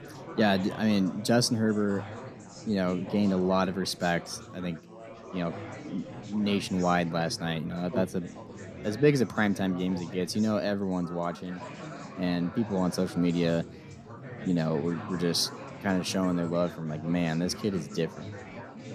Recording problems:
chatter from many people; noticeable; throughout; 15 dB below the speech

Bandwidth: 14 kHz